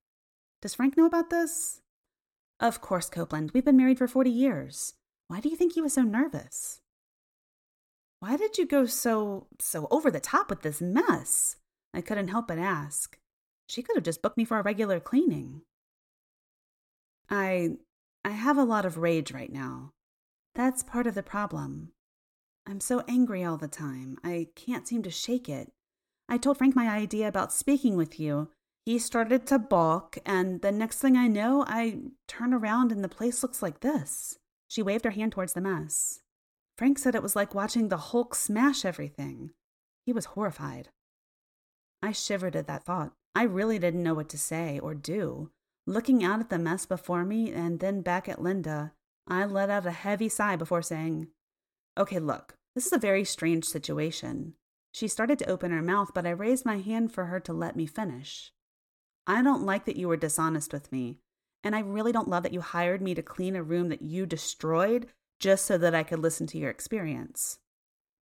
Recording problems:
uneven, jittery; strongly; from 0.5 s to 1:06

